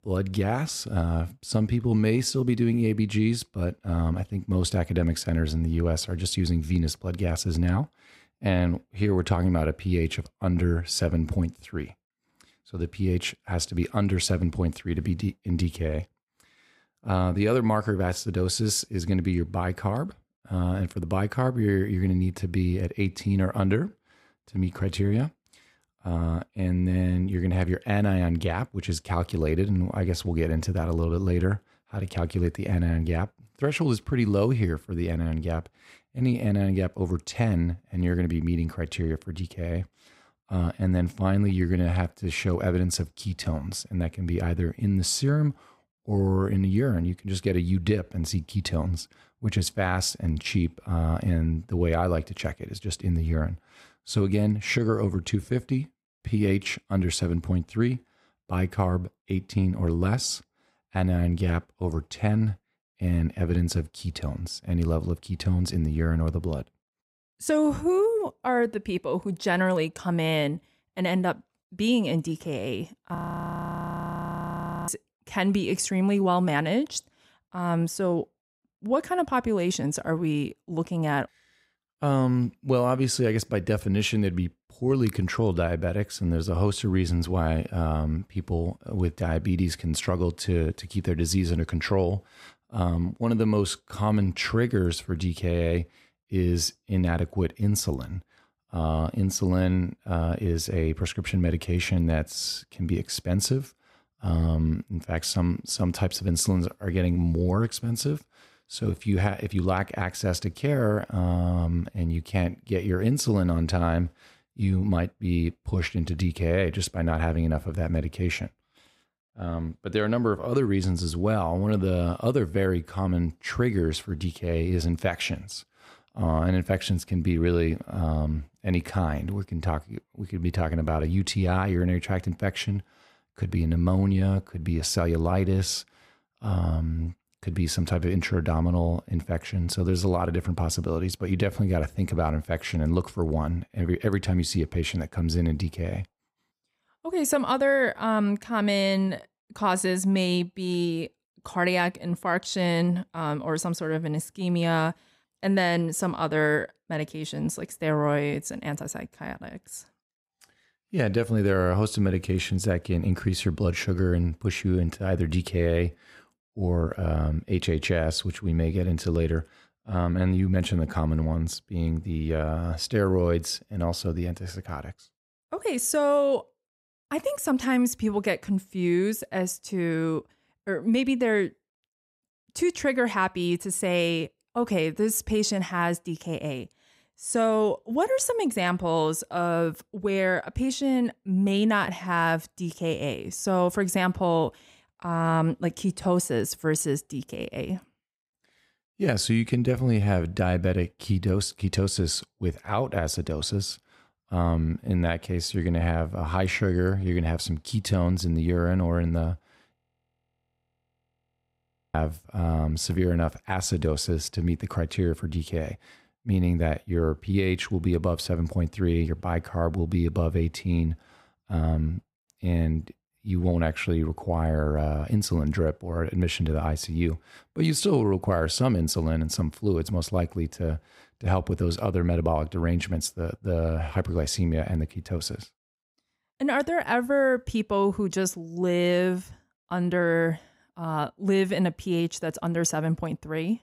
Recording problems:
audio freezing; at 1:13 for 1.5 s and at 3:30 for 2 s

